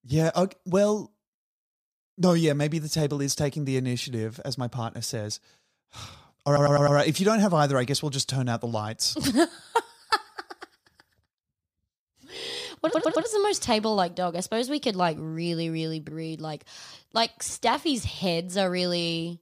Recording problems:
audio stuttering; at 6.5 s and at 13 s

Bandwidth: 15 kHz